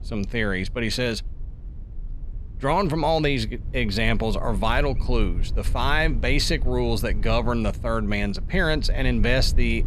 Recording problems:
low rumble; faint; throughout; 25 dB below the speech

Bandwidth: 14 kHz